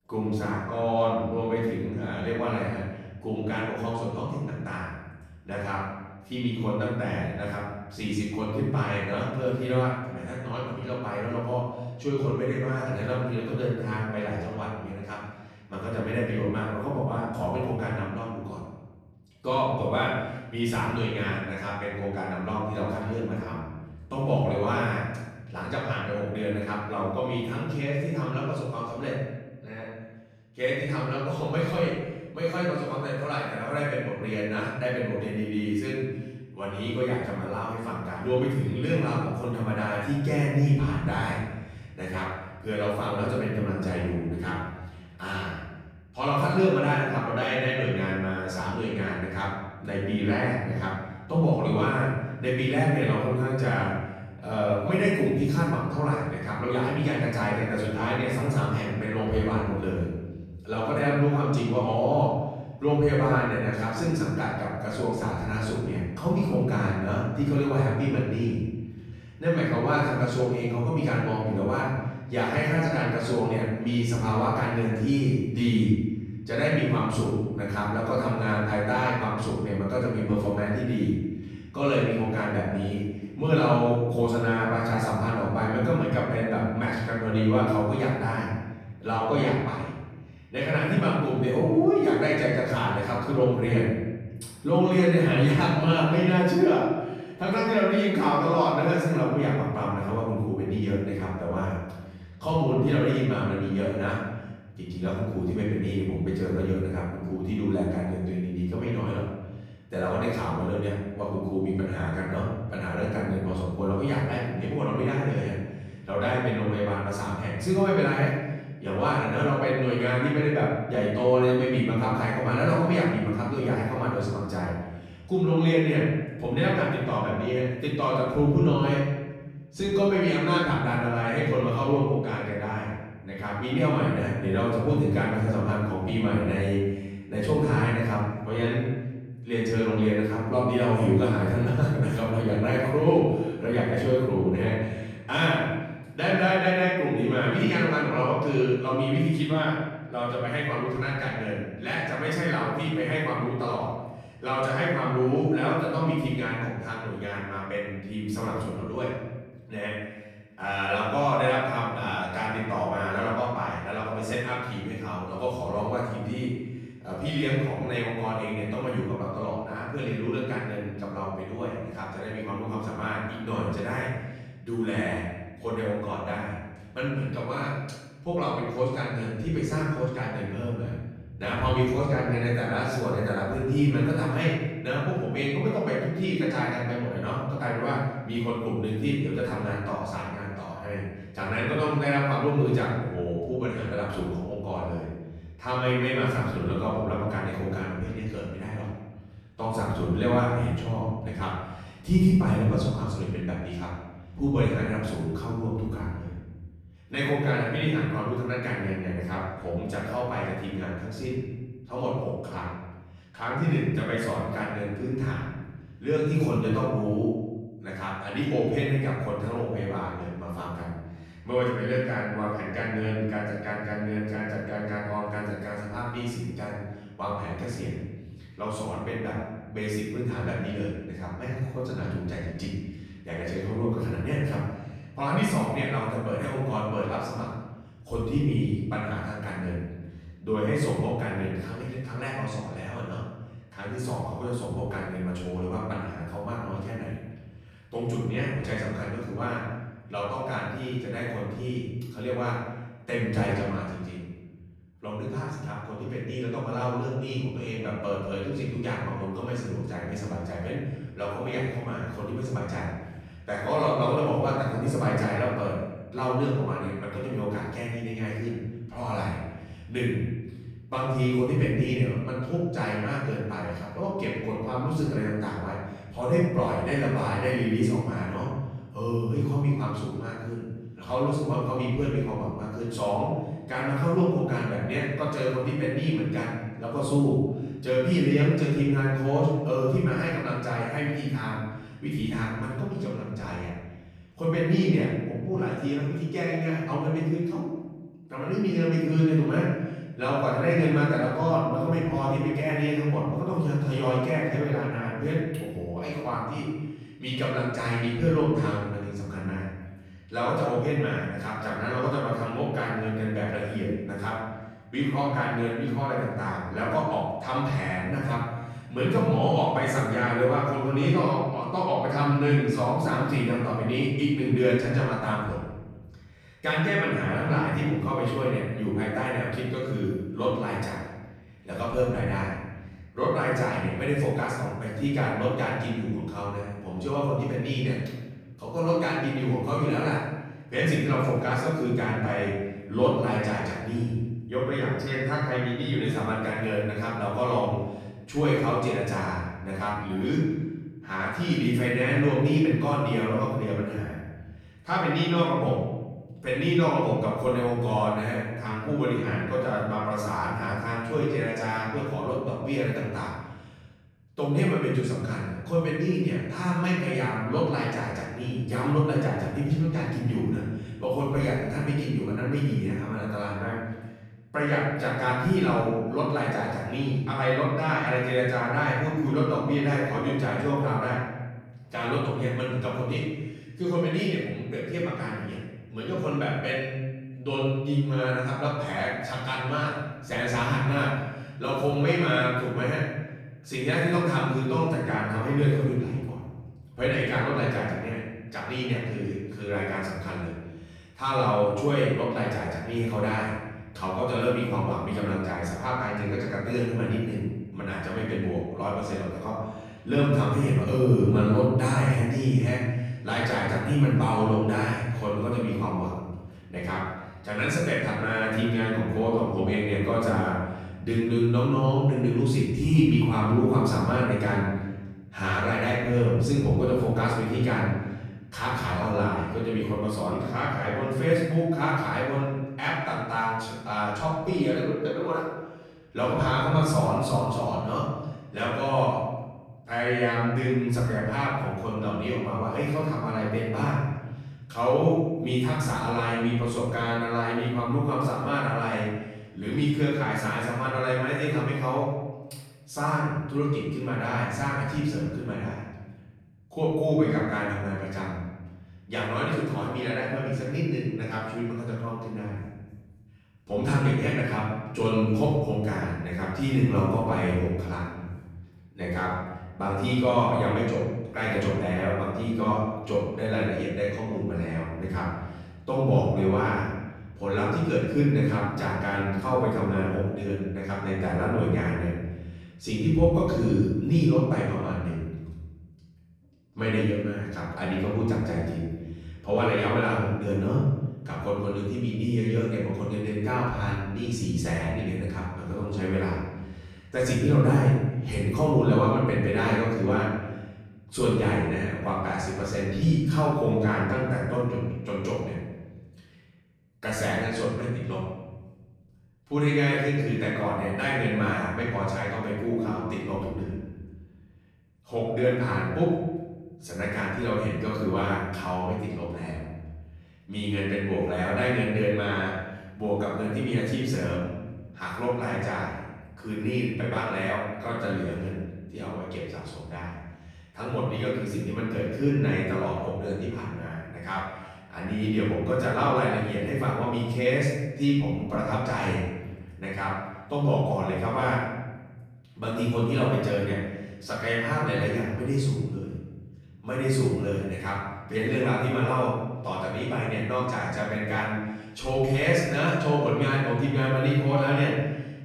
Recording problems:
off-mic speech; far
room echo; noticeable; dies away in 1.2 s

